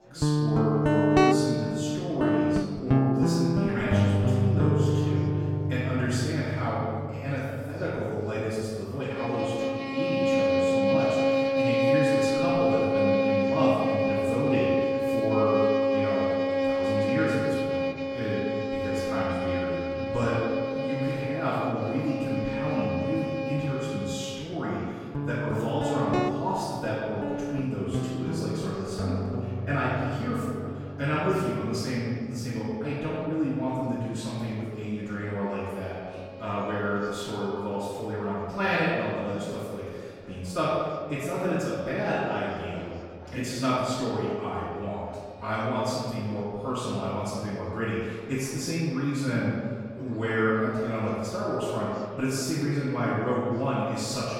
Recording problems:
room echo; strong; dies away in 1.8 s
off-mic speech; far
background music; very loud; throughout; 3 dB above the speech
chatter from many people; faint; throughout; 20 dB below the speech

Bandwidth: 16 kHz